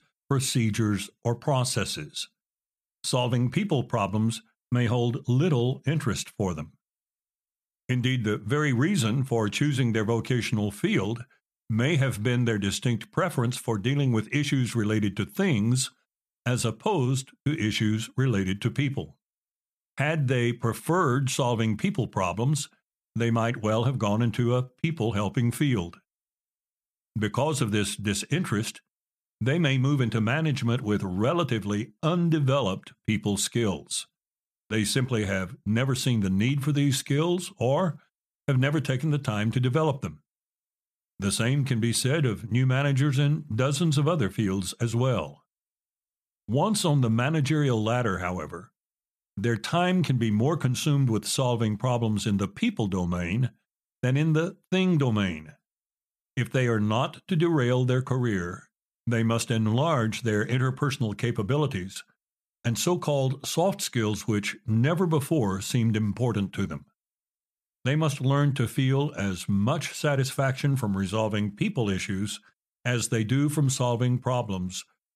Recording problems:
none

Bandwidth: 14.5 kHz